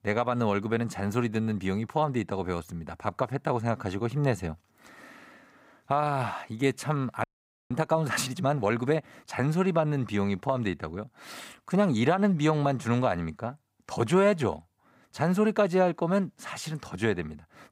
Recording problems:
audio freezing; at 7 s

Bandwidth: 15.5 kHz